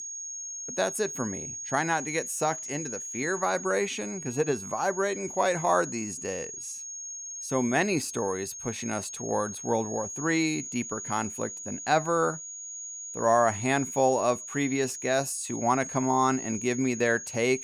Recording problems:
high-pitched whine; loud; throughout; 6.5 kHz, 8 dB below the speech

